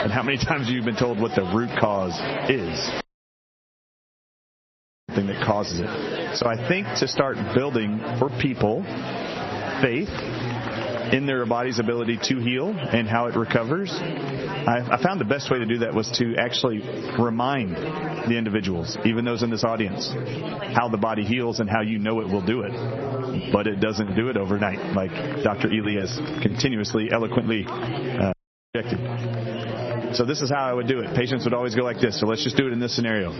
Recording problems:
garbled, watery; slightly; nothing above 6 kHz
squashed, flat; somewhat, background pumping
chatter from many people; loud; throughout; 8 dB below the speech
audio cutting out; at 3 s for 2 s and at 28 s

